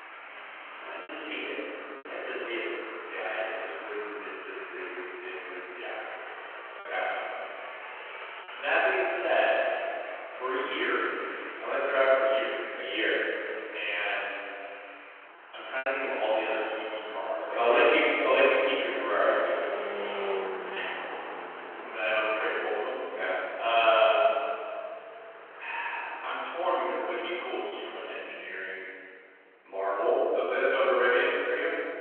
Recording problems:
room echo; strong; dies away in 2.5 s
off-mic speech; far
phone-call audio
traffic noise; noticeable; throughout; 10 dB below the speech
choppy; occasionally; 2% of the speech affected

